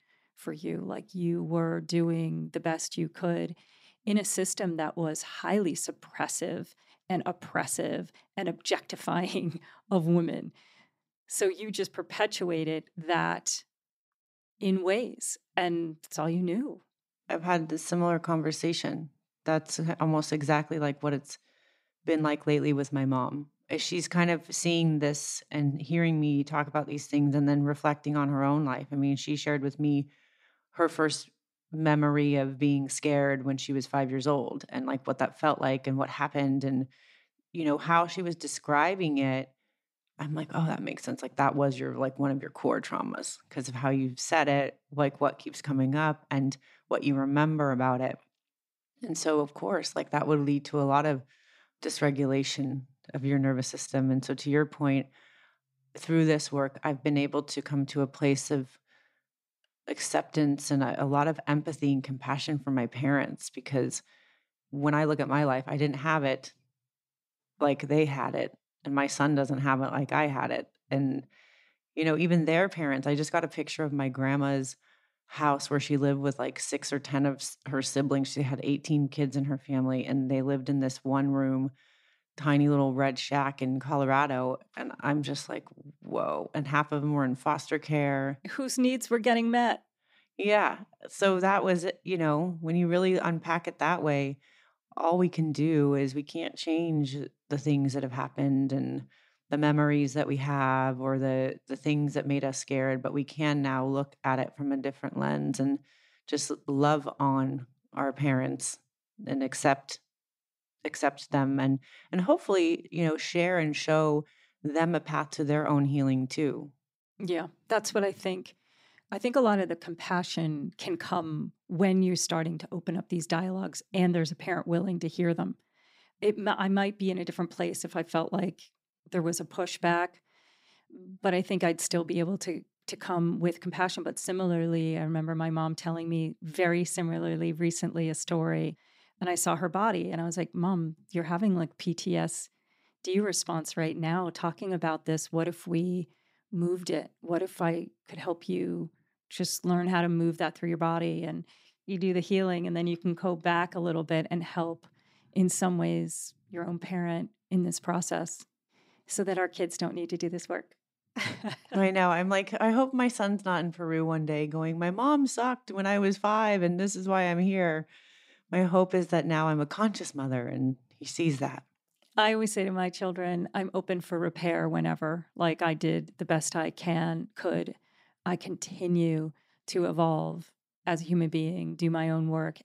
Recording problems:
none

